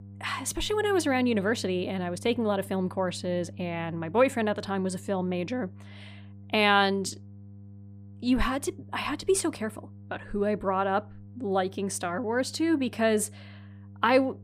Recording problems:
electrical hum; faint; throughout; 50 Hz, 30 dB below the speech

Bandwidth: 15 kHz